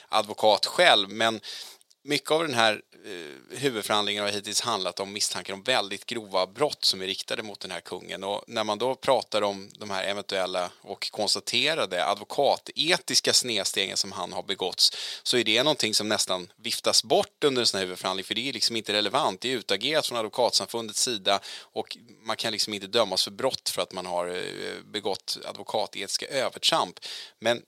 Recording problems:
thin; somewhat; fading below 400 Hz

